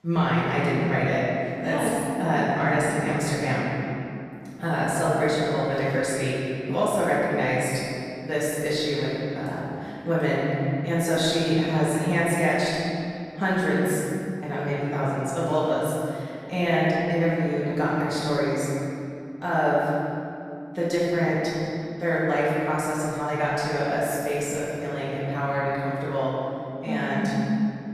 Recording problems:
room echo; strong; dies away in 2.7 s
off-mic speech; far

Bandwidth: 14.5 kHz